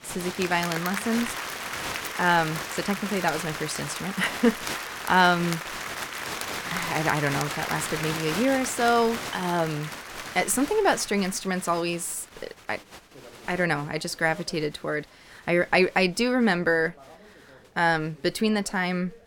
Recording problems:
crowd noise; loud; throughout; 7 dB below the speech

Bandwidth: 17 kHz